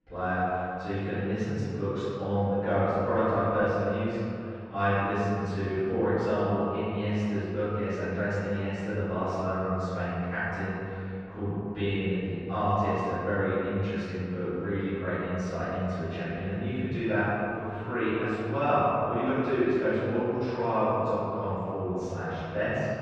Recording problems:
room echo; strong; dies away in 2.5 s
off-mic speech; far
muffled; very; fading above 2 kHz

